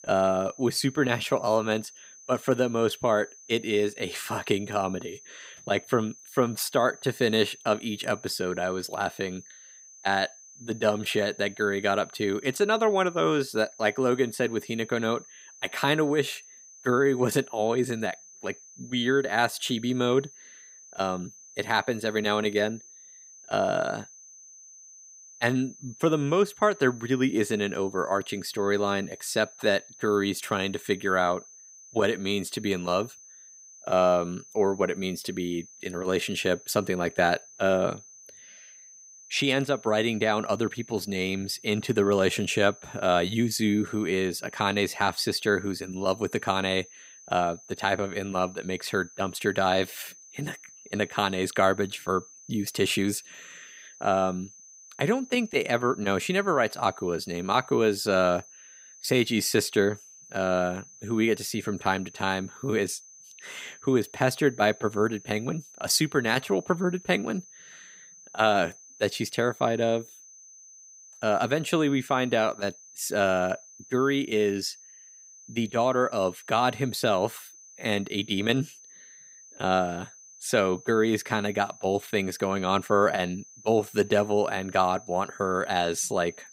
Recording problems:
high-pitched whine; faint; throughout; 6 kHz, 20 dB below the speech

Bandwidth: 15.5 kHz